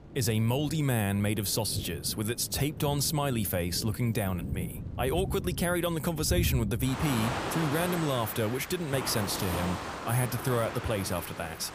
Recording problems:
rain or running water; loud; throughout; 7 dB below the speech

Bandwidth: 15 kHz